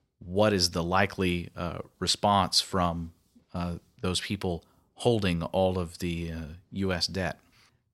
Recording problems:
none

